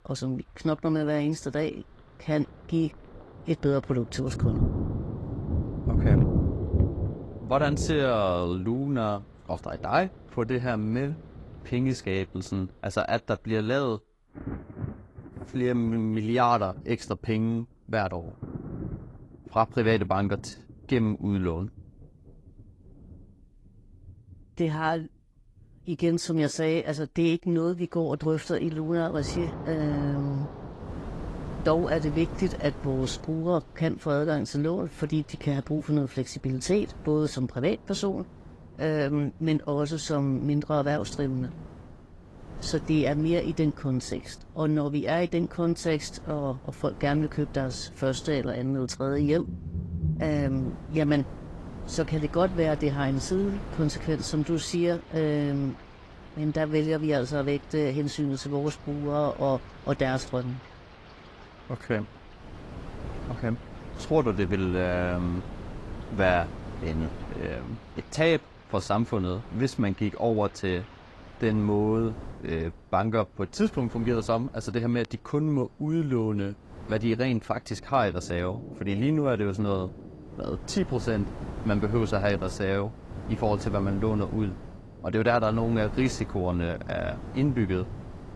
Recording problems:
garbled, watery; slightly
rain or running water; loud; throughout; 9 dB below the speech
wind noise on the microphone; occasional gusts; from 30 s on; 15 dB below the speech

